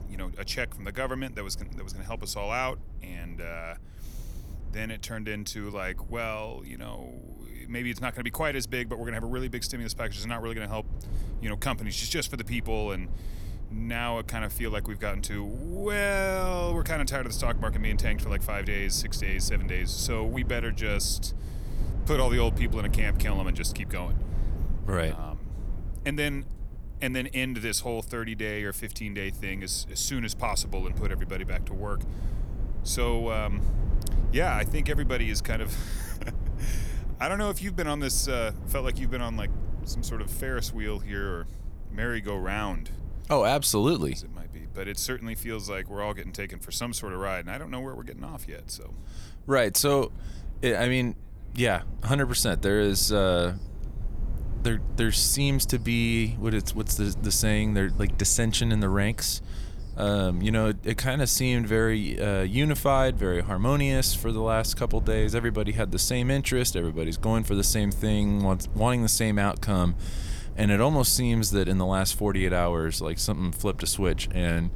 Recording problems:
low rumble; faint; throughout; 20 dB below the speech

